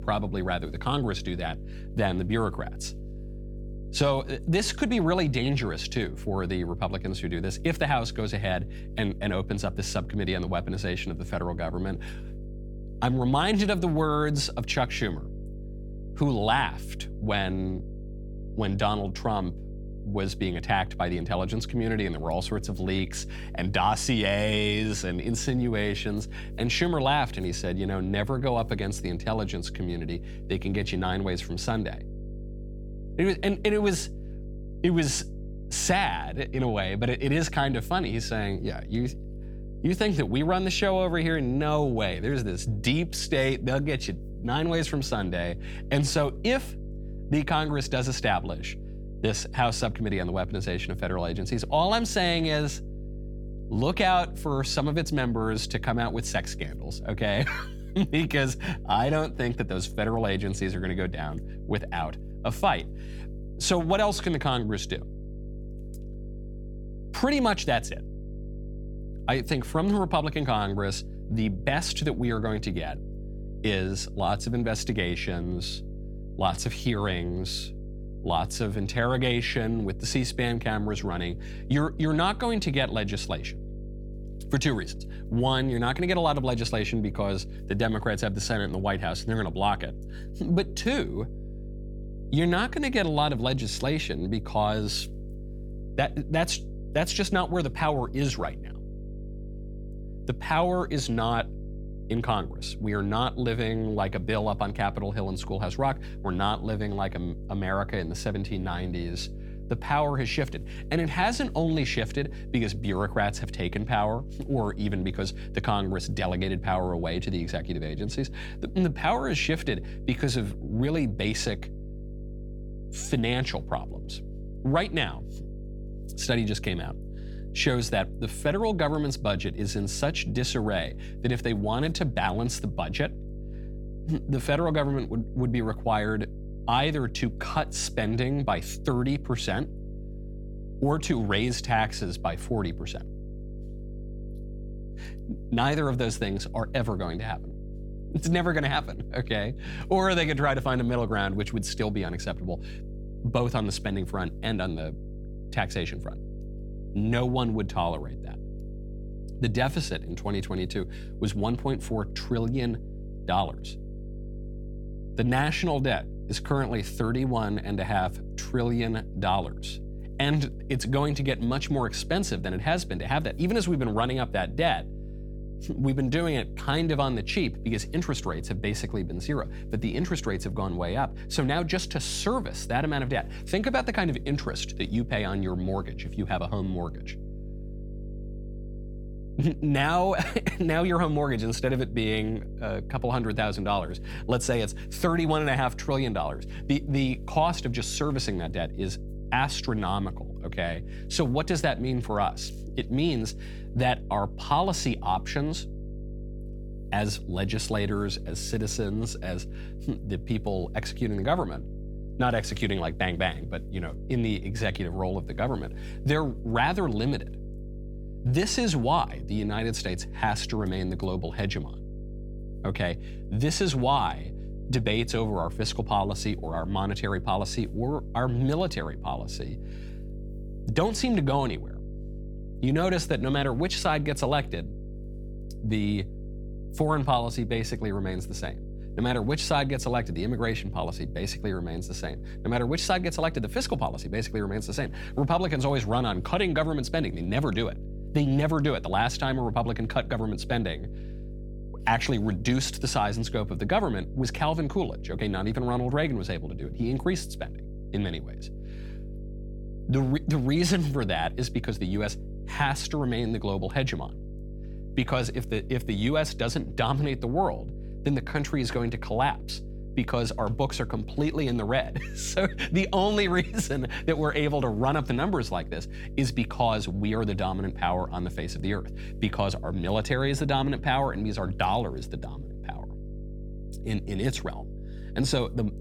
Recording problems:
electrical hum; noticeable; throughout; 50 Hz, 20 dB below the speech

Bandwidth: 17 kHz